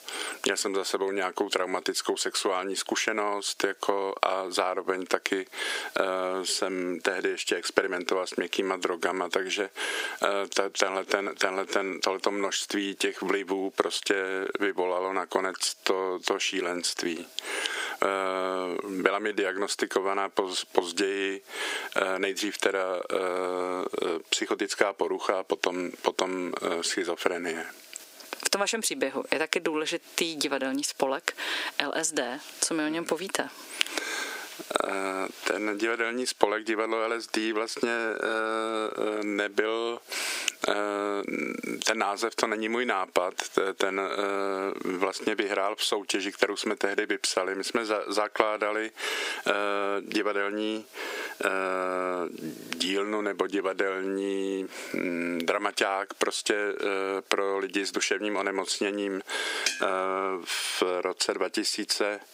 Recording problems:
thin; somewhat; fading below 350 Hz
squashed, flat; somewhat

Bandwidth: 15.5 kHz